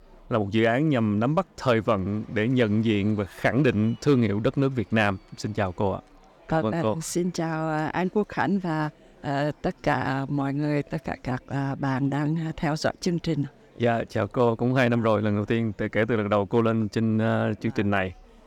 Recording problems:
murmuring crowd; faint; throughout; 30 dB below the speech

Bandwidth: 18 kHz